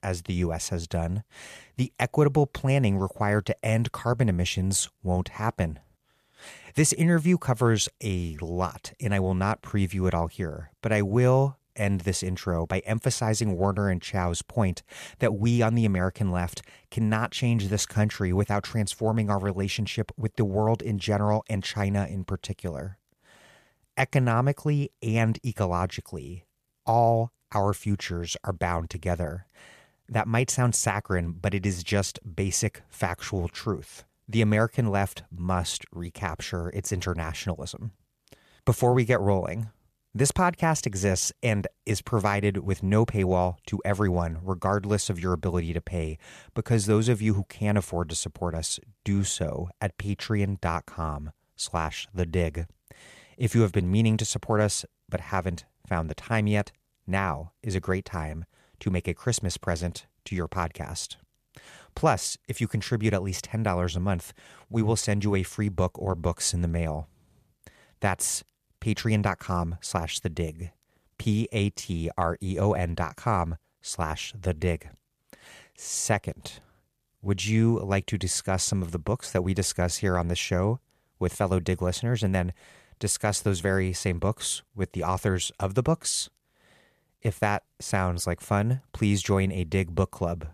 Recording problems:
none

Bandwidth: 14.5 kHz